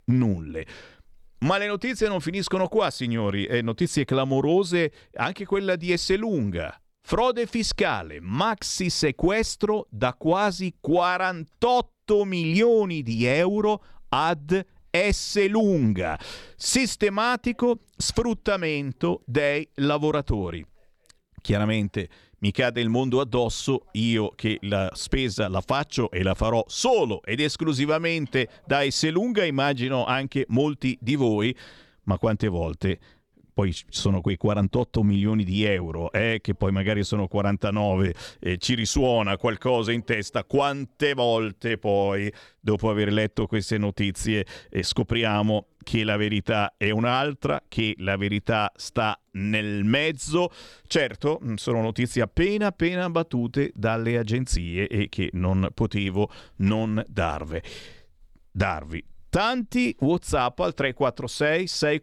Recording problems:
none

